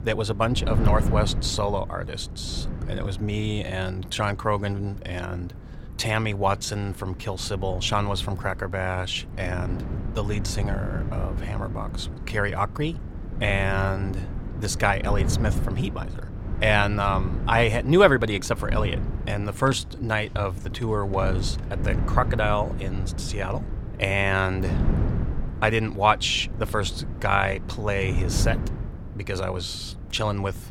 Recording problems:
wind noise on the microphone; occasional gusts; 15 dB below the speech

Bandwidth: 16.5 kHz